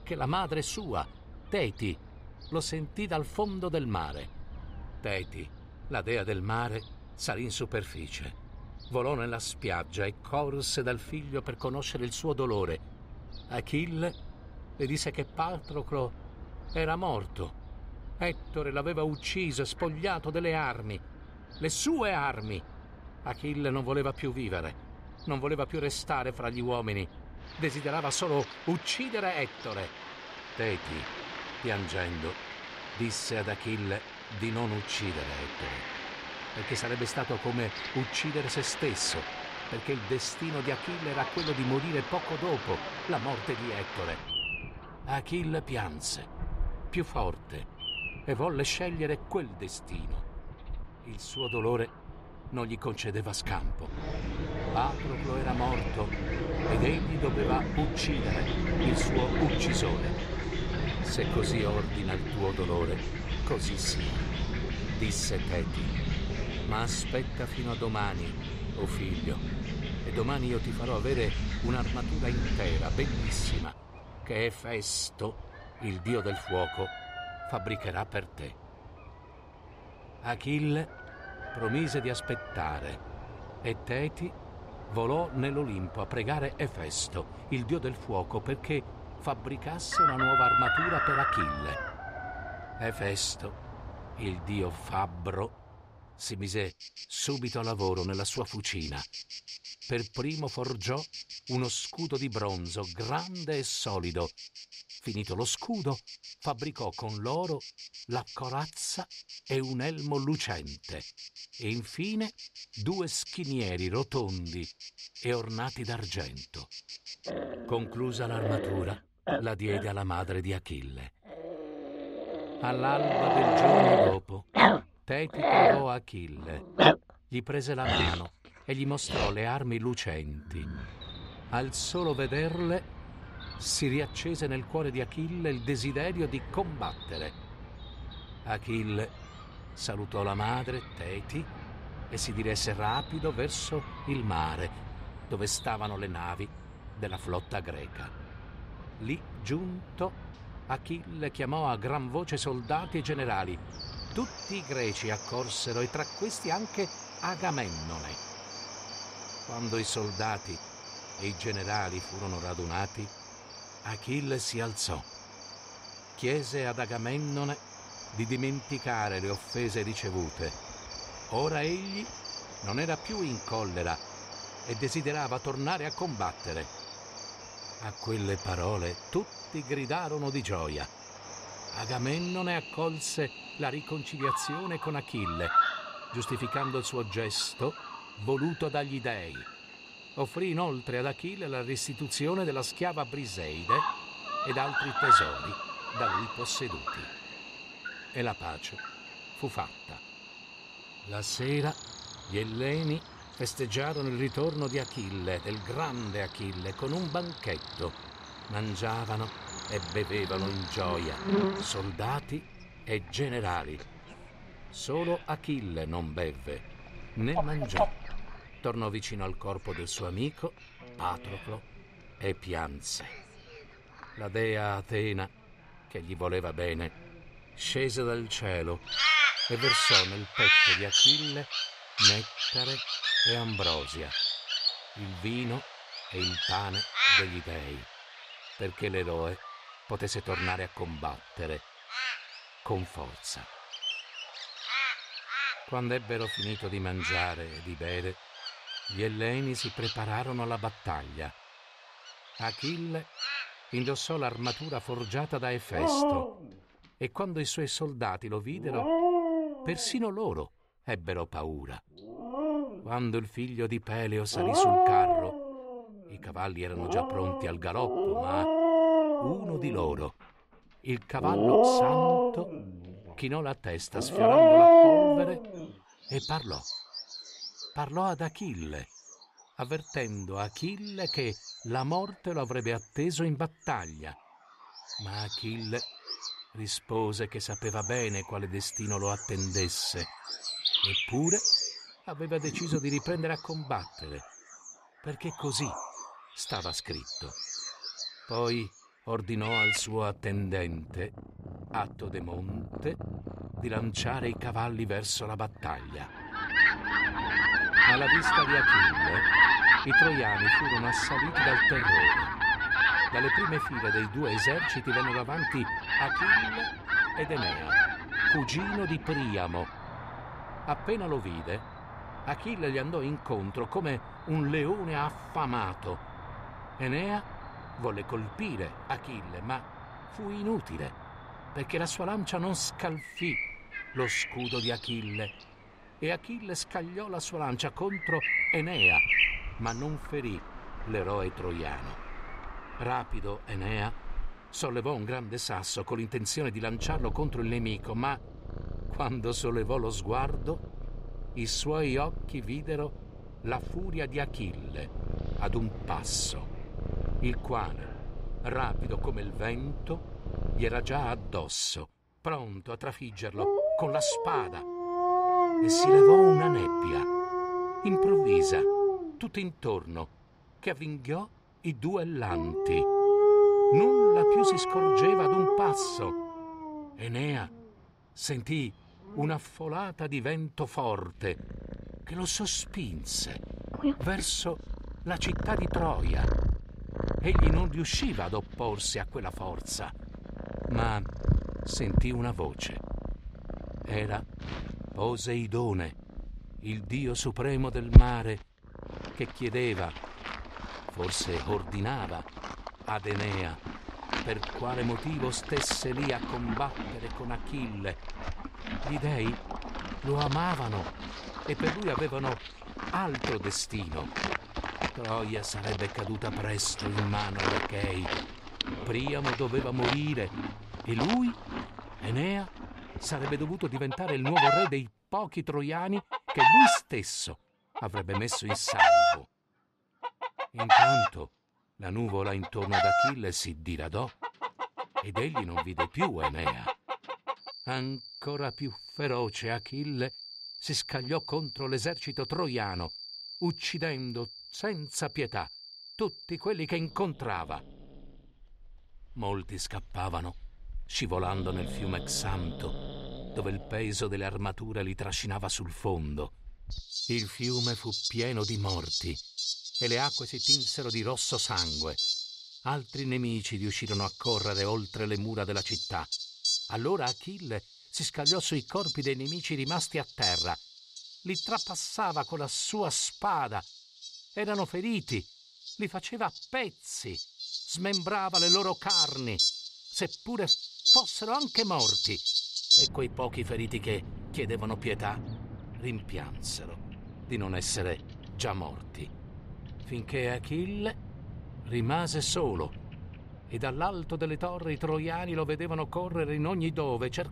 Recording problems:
animal sounds; very loud; throughout; 4 dB above the speech

